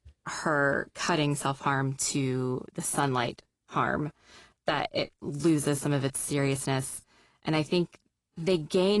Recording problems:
garbled, watery; slightly; nothing above 11.5 kHz
abrupt cut into speech; at the end

